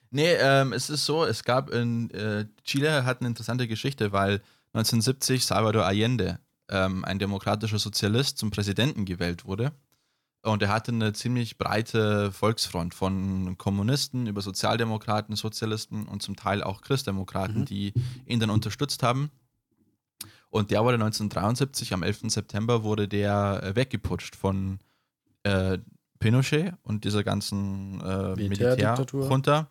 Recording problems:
none

